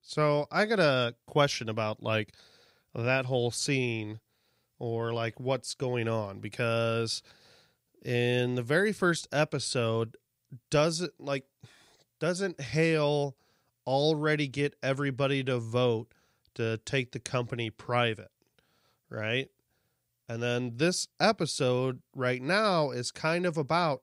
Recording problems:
none

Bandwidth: 15.5 kHz